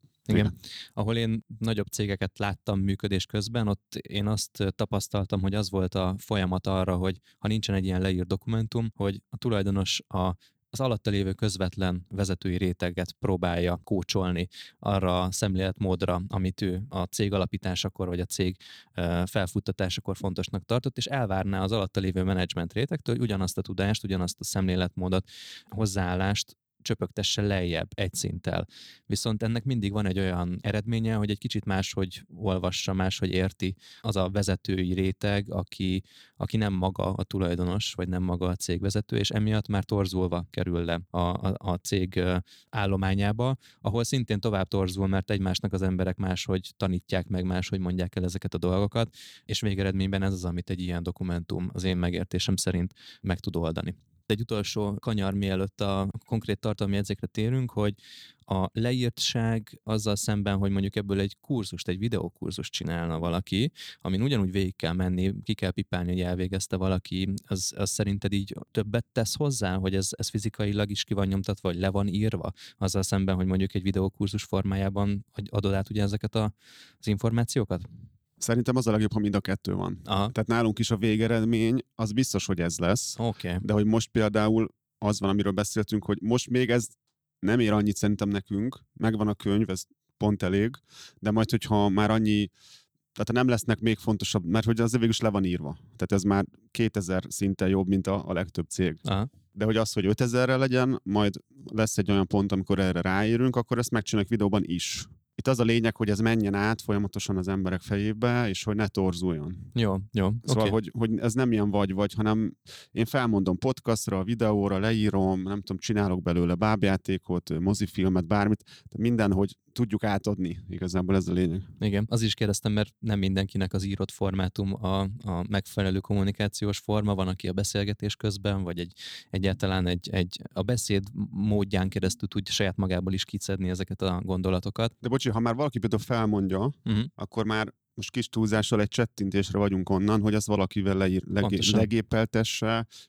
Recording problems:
none

